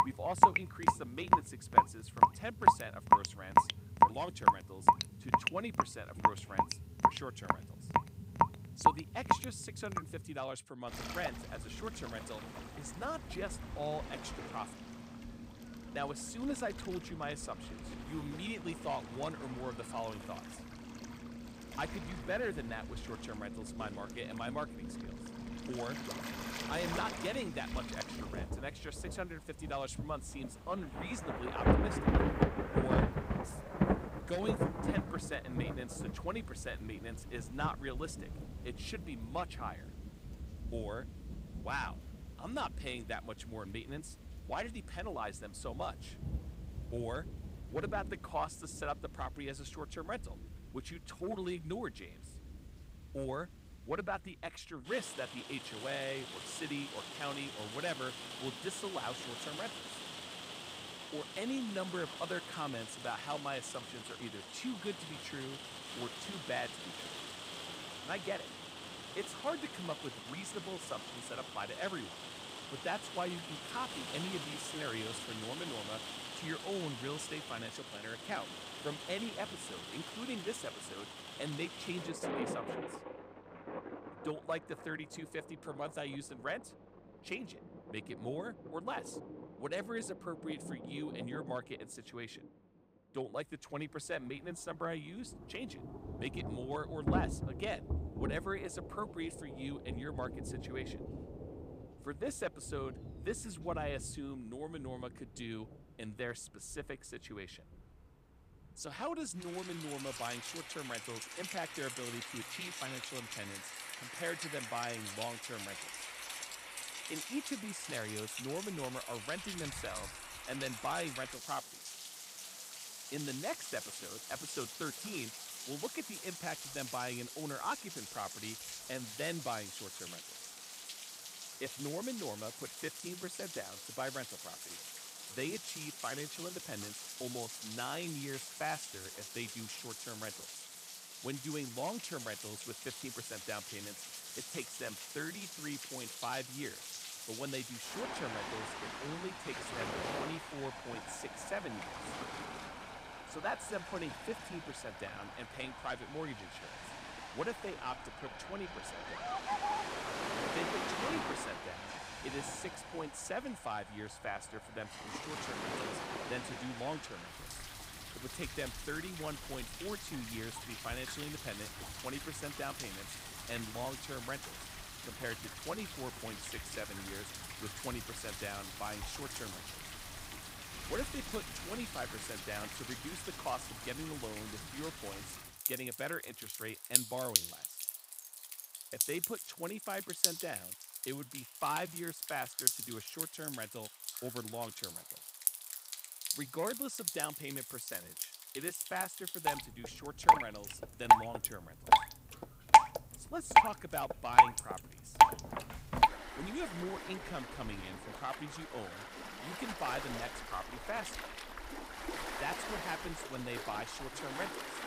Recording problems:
rain or running water; very loud; throughout; 4 dB above the speech

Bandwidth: 15.5 kHz